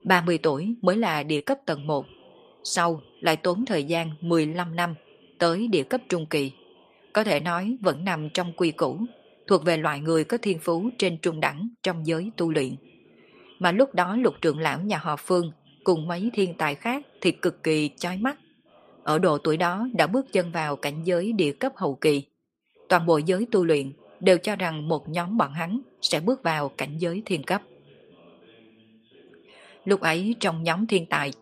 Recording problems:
voice in the background; faint; throughout; 30 dB below the speech

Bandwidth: 15 kHz